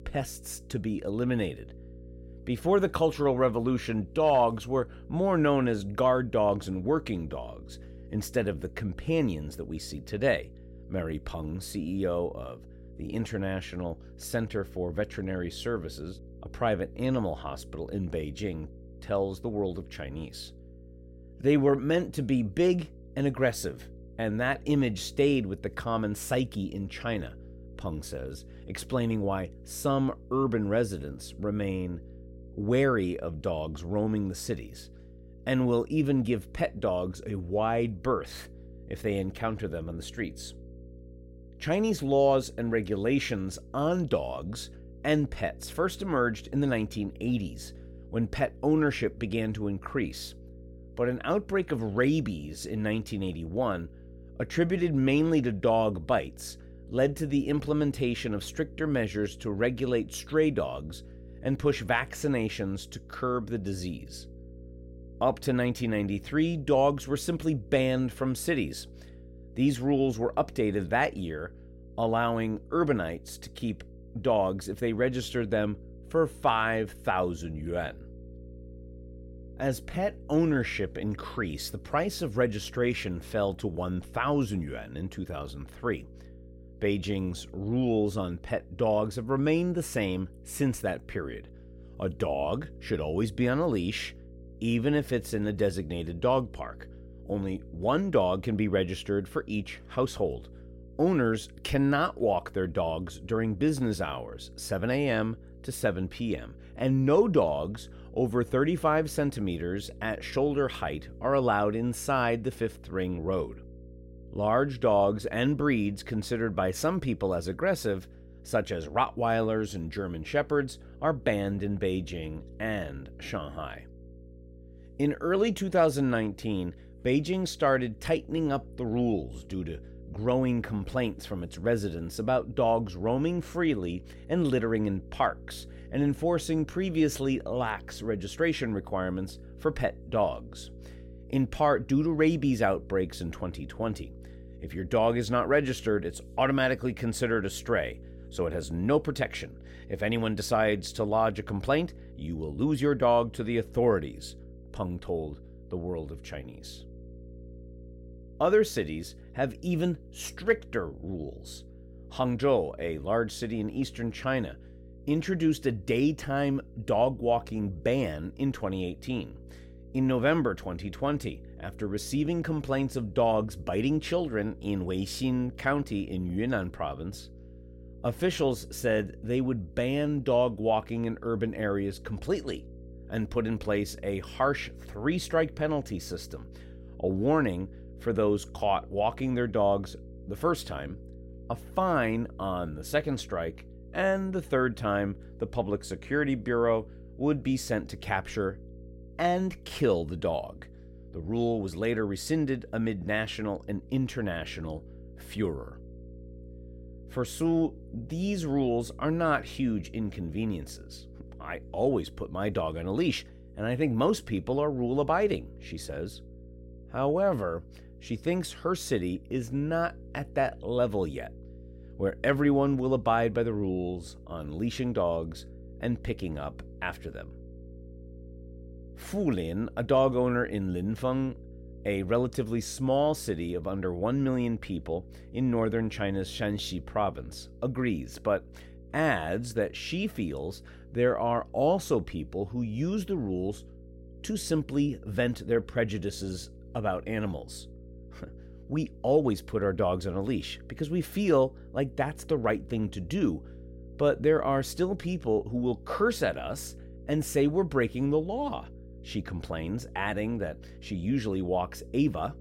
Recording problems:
electrical hum; faint; throughout; 60 Hz, 25 dB below the speech

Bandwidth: 16 kHz